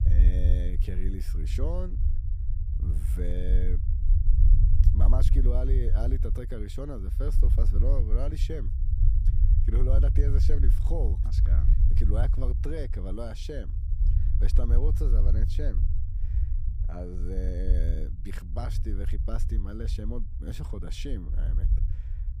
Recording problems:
low rumble; loud; throughout; 6 dB below the speech

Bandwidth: 15 kHz